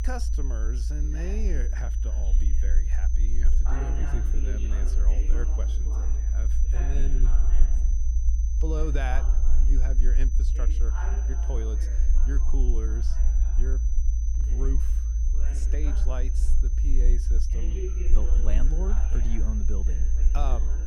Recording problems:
high-pitched whine; loud; throughout; 6 kHz, 10 dB below the speech
voice in the background; loud; throughout; 7 dB below the speech
low rumble; loud; throughout; 7 dB below the speech

